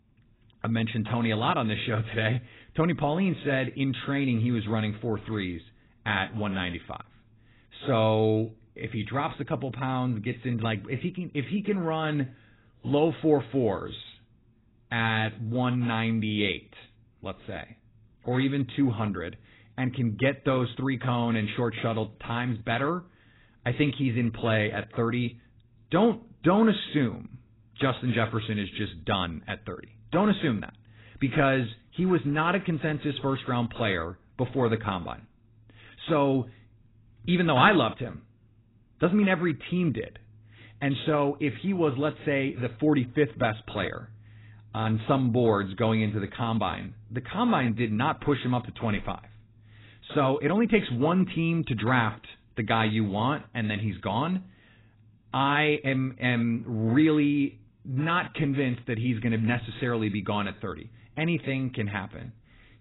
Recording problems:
garbled, watery; badly; nothing above 4 kHz

